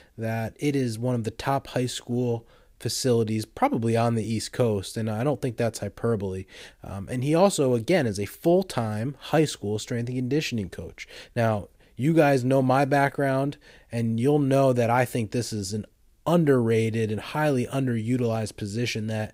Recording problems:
none

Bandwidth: 15.5 kHz